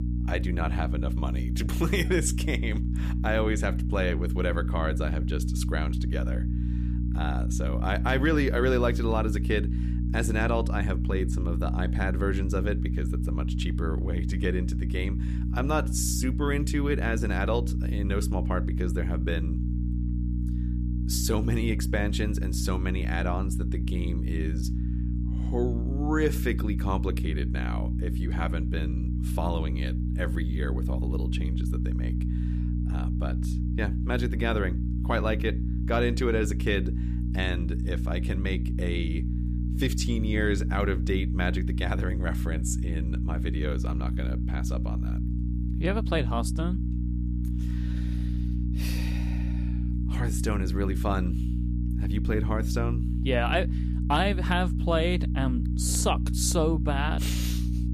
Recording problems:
electrical hum; loud; throughout; 60 Hz, 9 dB below the speech

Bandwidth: 14.5 kHz